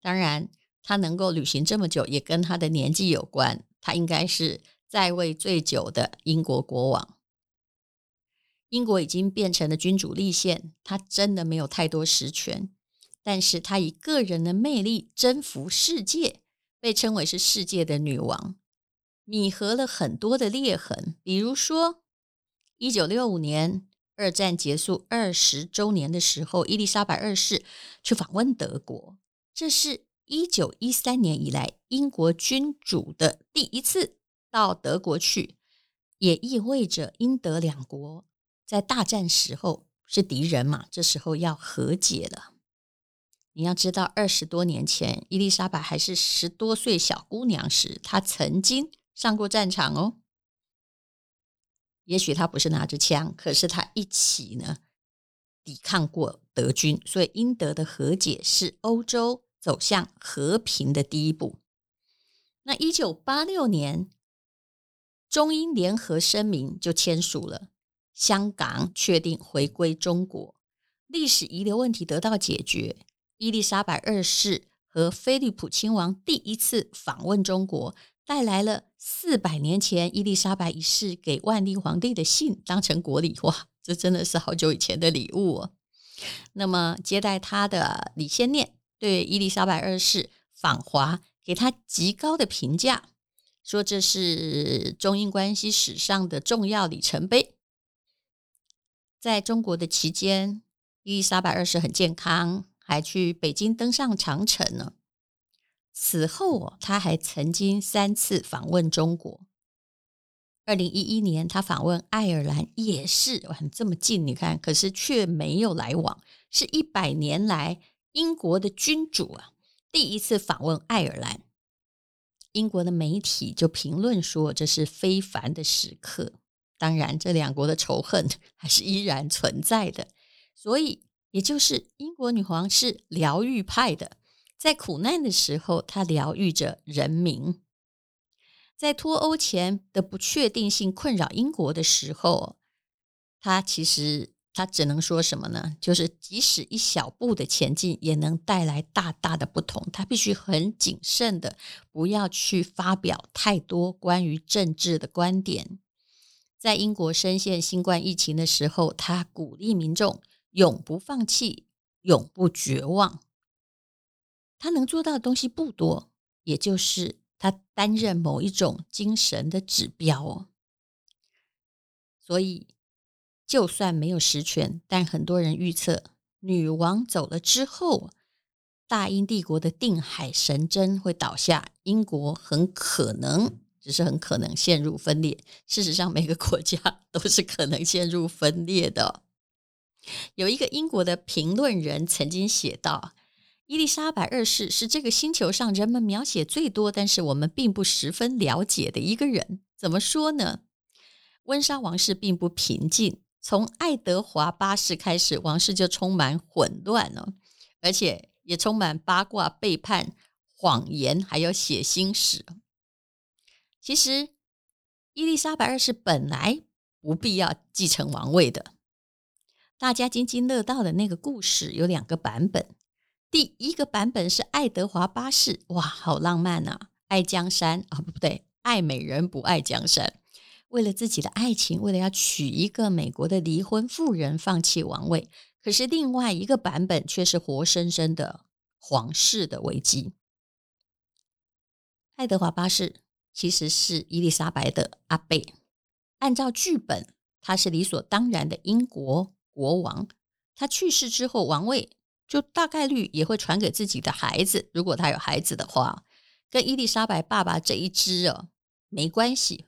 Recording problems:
none

